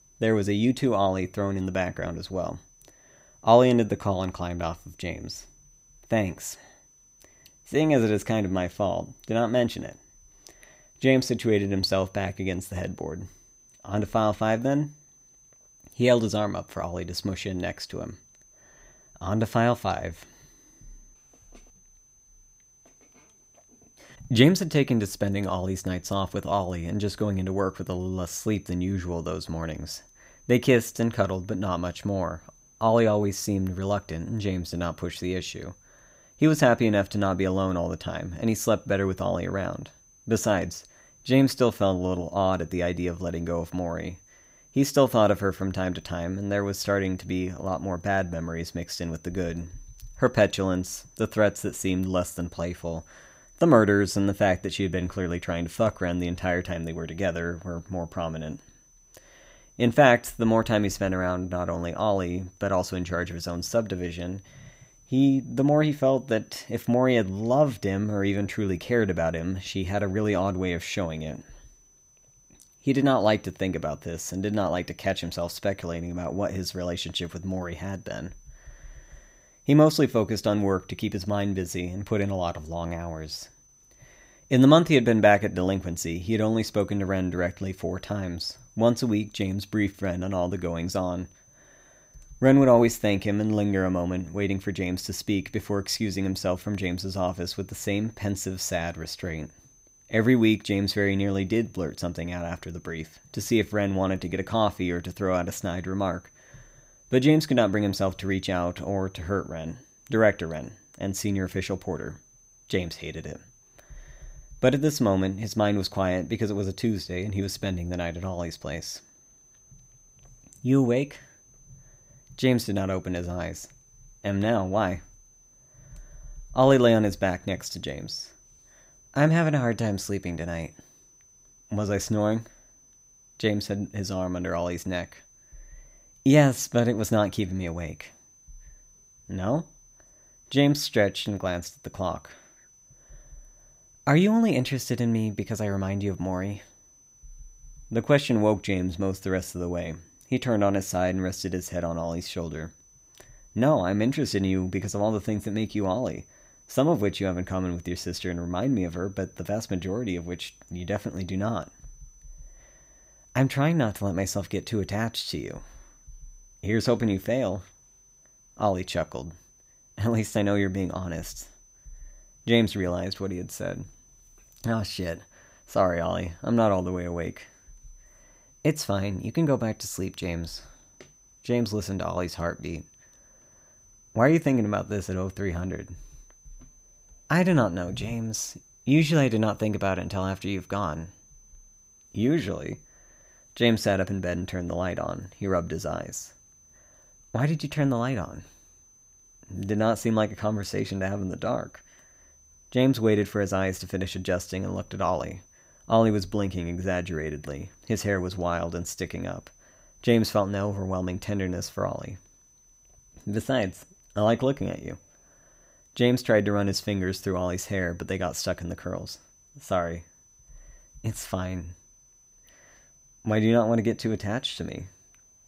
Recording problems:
high-pitched whine; faint; throughout; 6 kHz, 30 dB below the speech

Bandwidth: 15.5 kHz